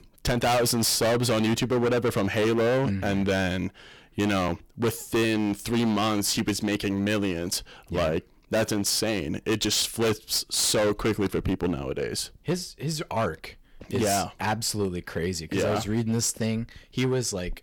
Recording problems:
distortion; heavy; 16% of the sound clipped

